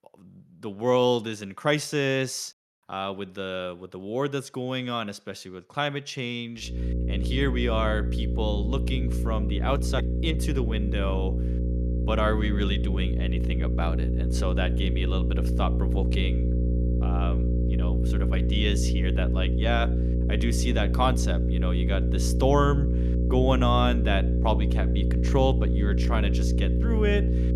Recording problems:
electrical hum; loud; from 6.5 s on; 60 Hz, 7 dB below the speech

